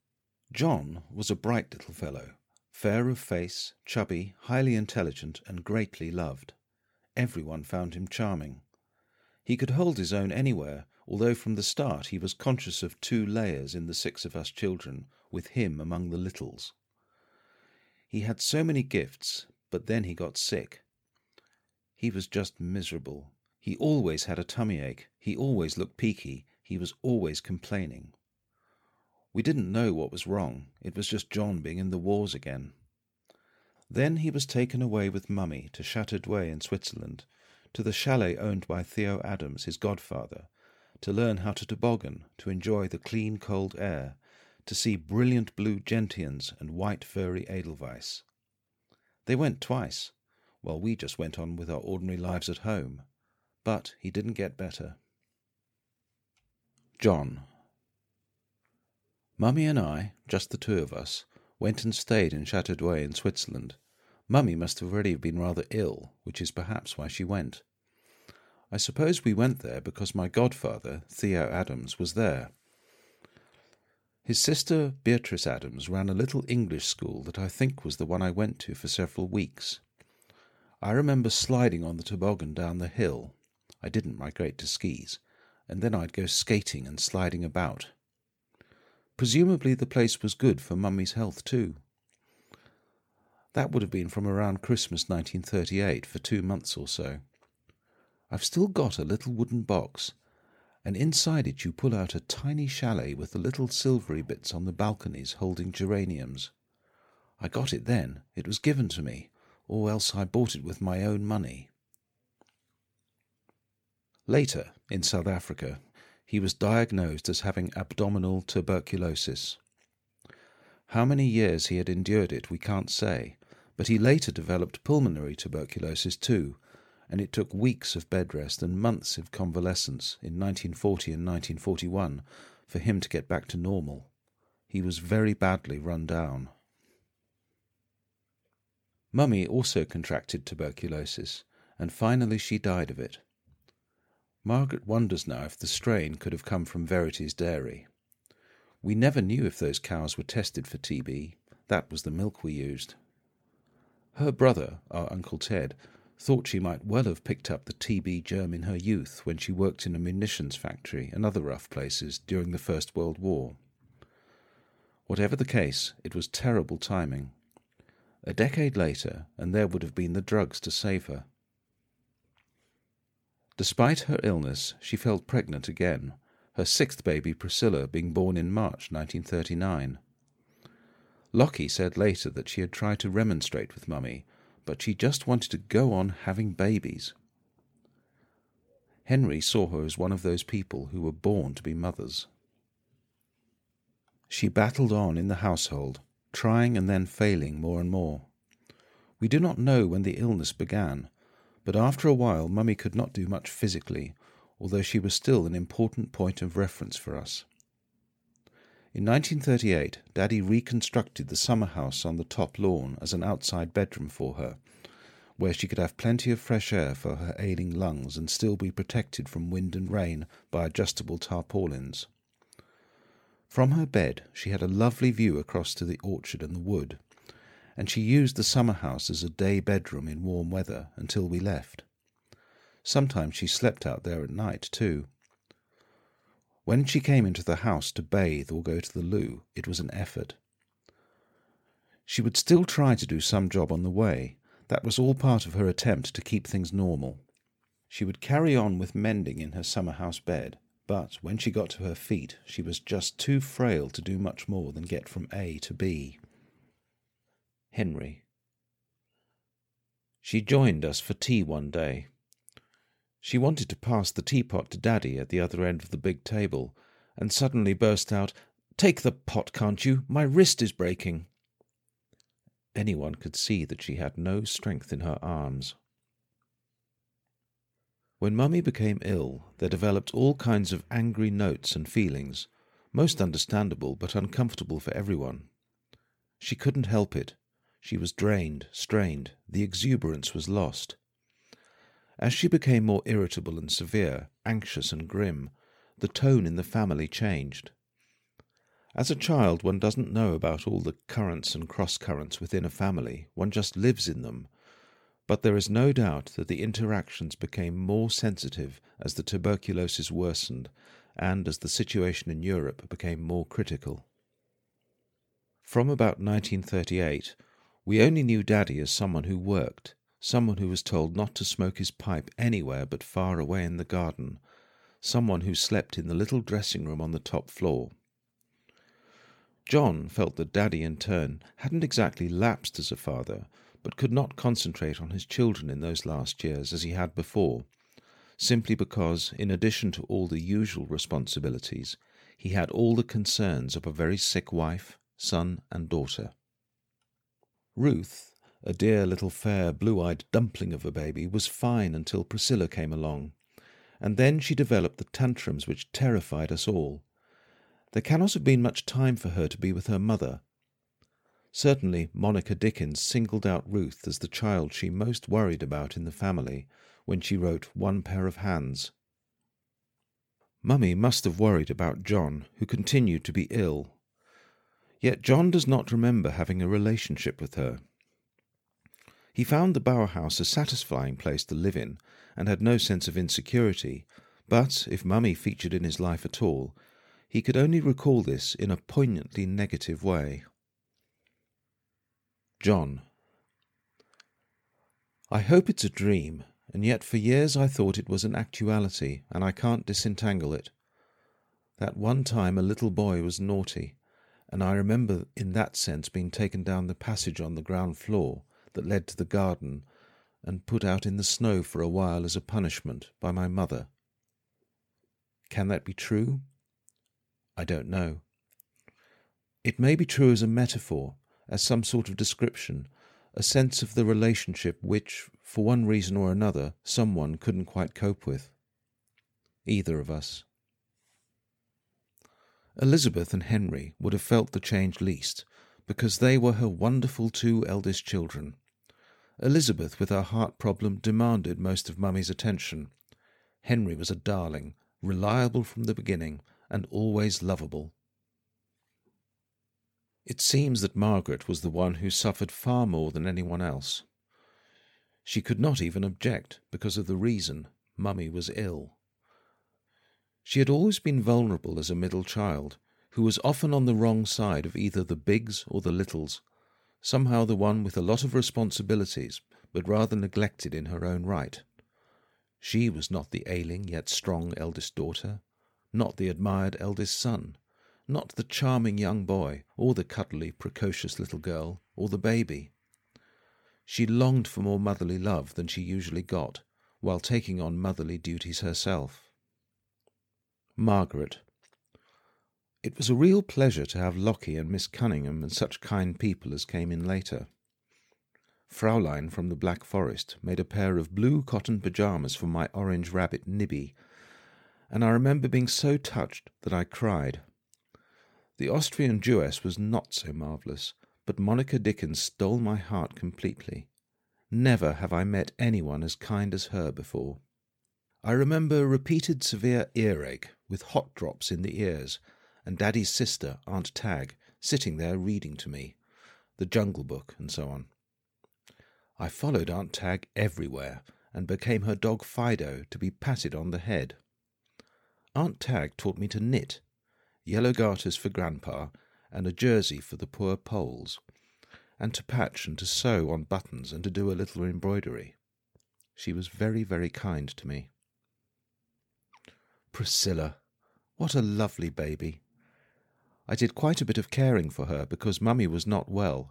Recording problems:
none

